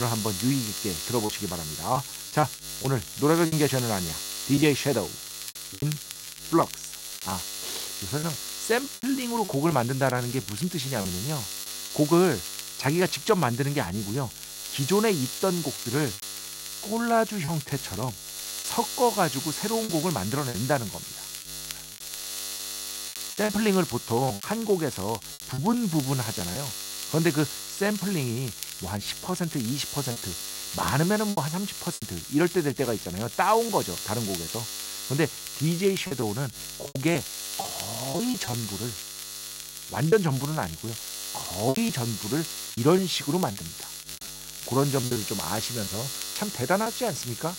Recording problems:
electrical hum; loud; throughout; 60 Hz, 7 dB below the speech
crackle, like an old record; noticeable; 15 dB below the speech
high-pitched whine; faint; throughout; 3 kHz, 30 dB below the speech
choppy; very; 6% of the speech affected
abrupt cut into speech; at the start

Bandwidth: 16 kHz